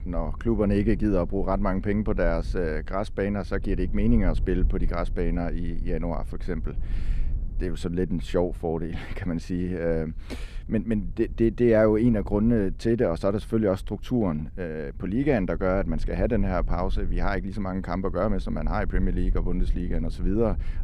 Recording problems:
low rumble; faint; throughout; 25 dB below the speech

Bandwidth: 14.5 kHz